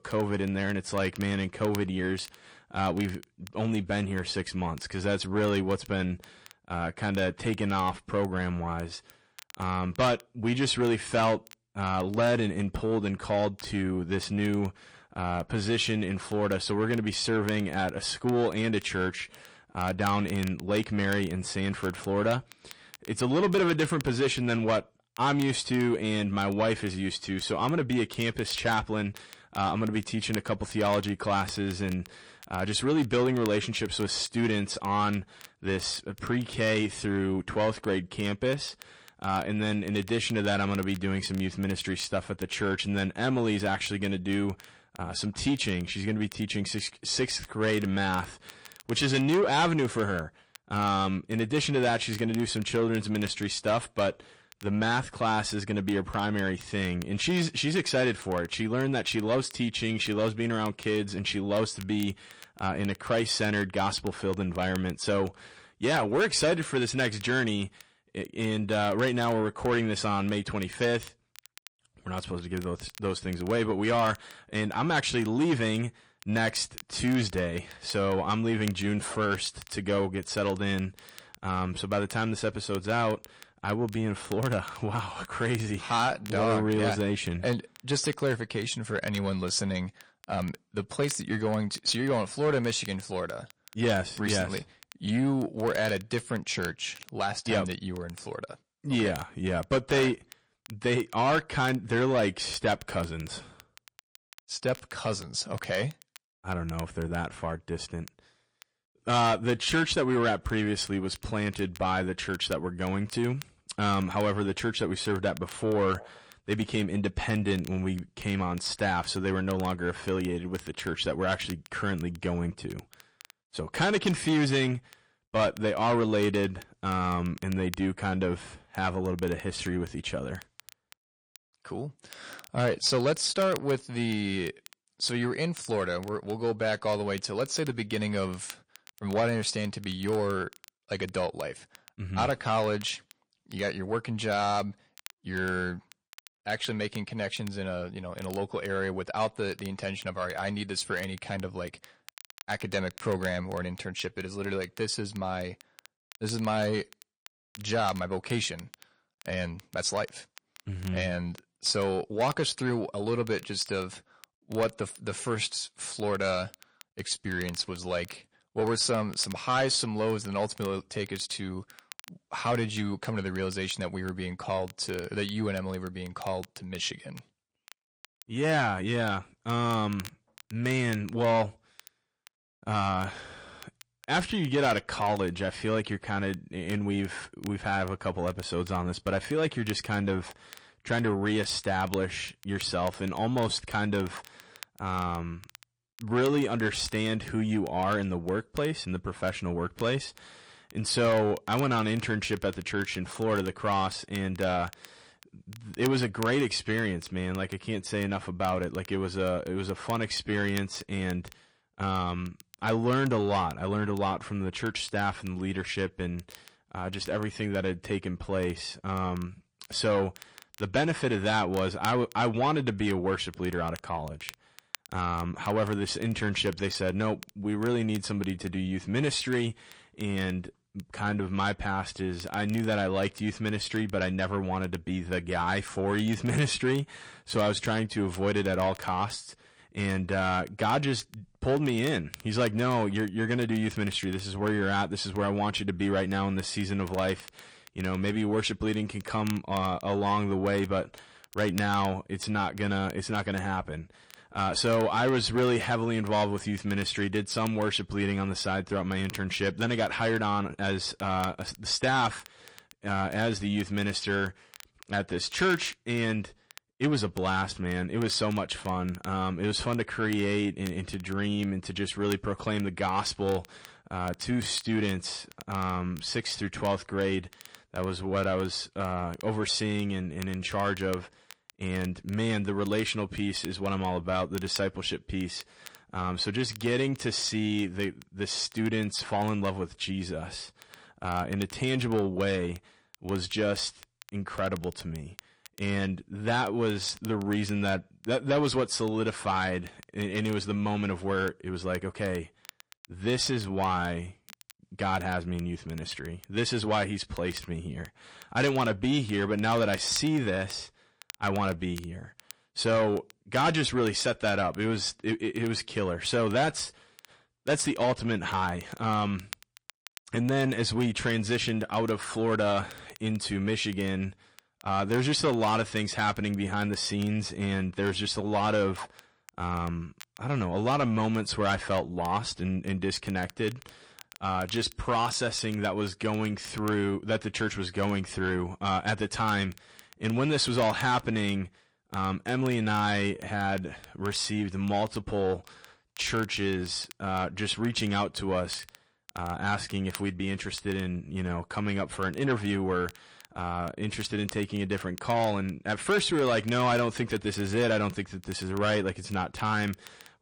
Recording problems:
distortion; slight; 10 dB below the speech
garbled, watery; slightly; nothing above 8.5 kHz
crackle, like an old record; faint; 20 dB below the speech

